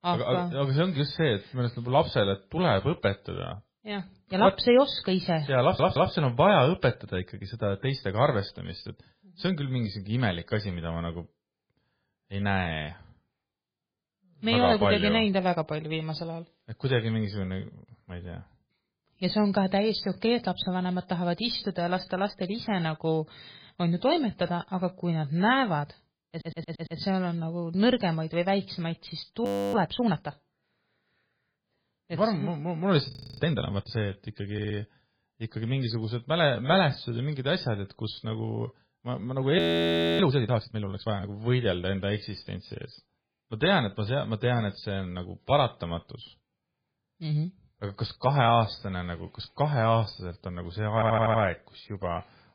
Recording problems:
garbled, watery; badly; nothing above 4 kHz
audio stuttering; 4 times, first at 5.5 s
audio freezing; at 29 s, at 33 s and at 40 s for 0.5 s

